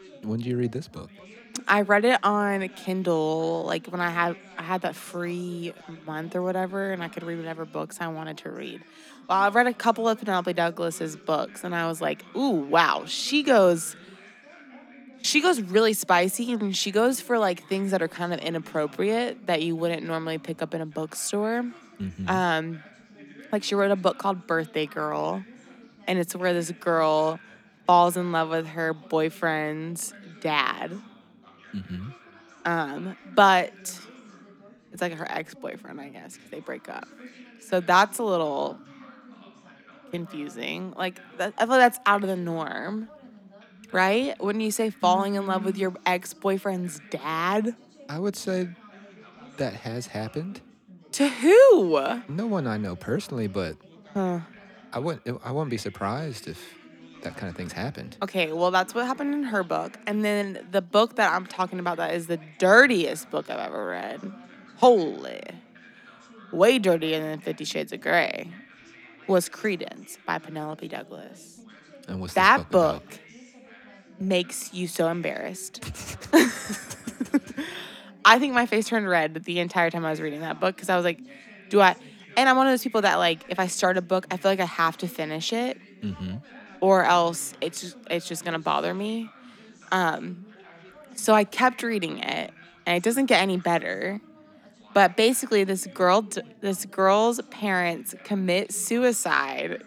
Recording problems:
background chatter; faint; throughout; 4 voices, 25 dB below the speech

